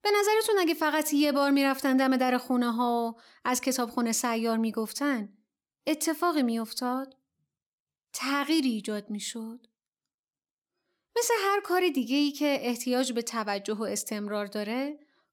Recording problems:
none

